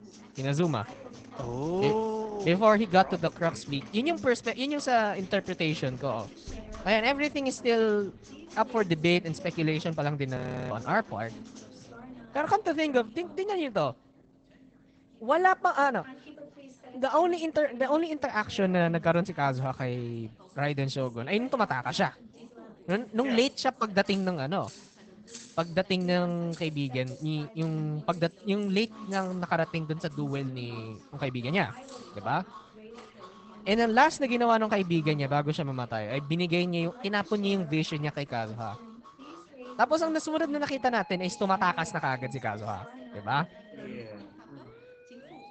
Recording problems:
garbled, watery; badly; nothing above 8 kHz
household noises; faint; until 34 s; 25 dB below the speech
background music; faint; throughout; 25 dB below the speech
background chatter; faint; throughout; 3 voices, 20 dB below the speech
audio freezing; at 10 s

